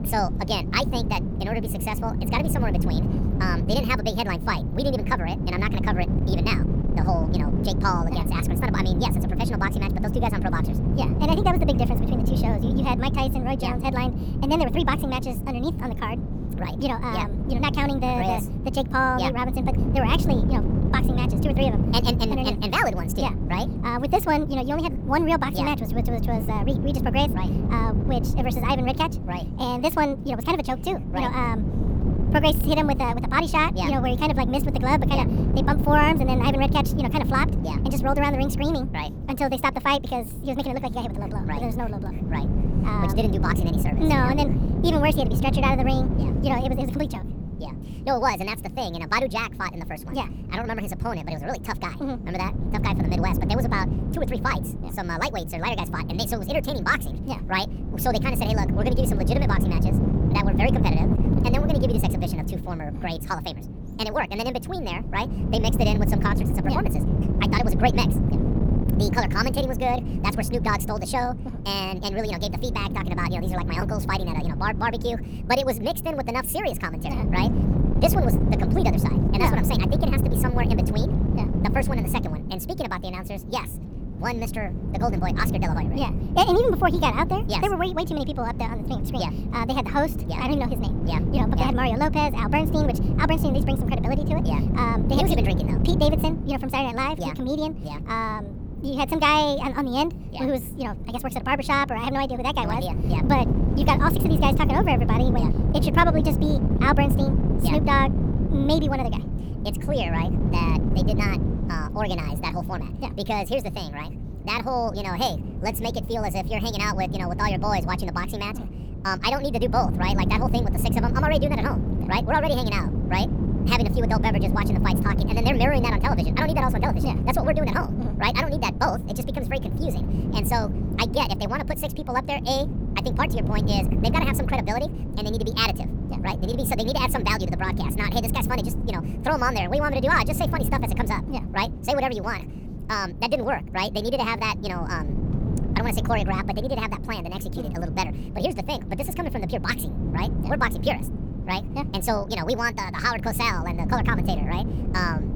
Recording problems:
wrong speed and pitch; too fast and too high; 1.6 times normal speed
wind noise on the microphone; heavy; 9 dB below the speech

